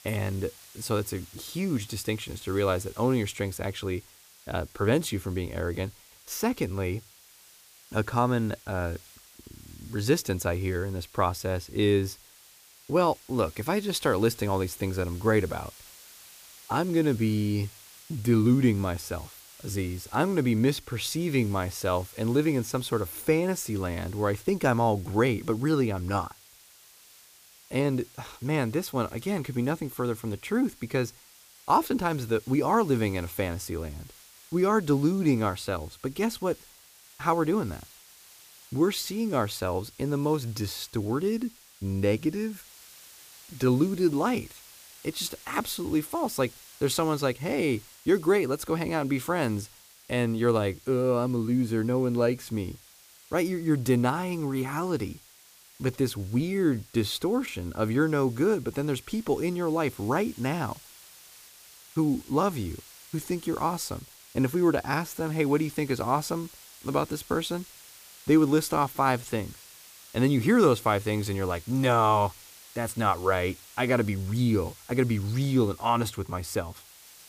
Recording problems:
hiss; faint; throughout; 20 dB below the speech

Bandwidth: 15 kHz